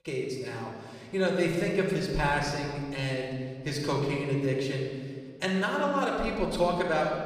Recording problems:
off-mic speech; far
room echo; noticeable; dies away in 1.7 s

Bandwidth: 14.5 kHz